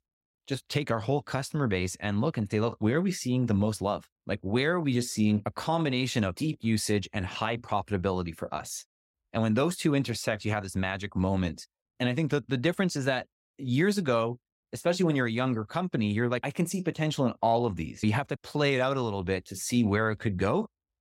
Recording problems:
none

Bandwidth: 16 kHz